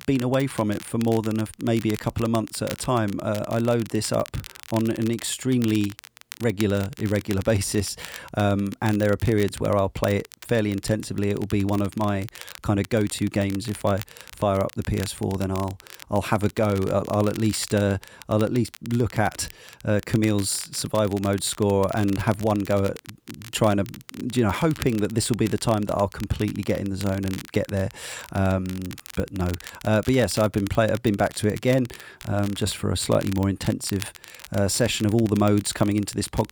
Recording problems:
crackle, like an old record; noticeable; 15 dB below the speech

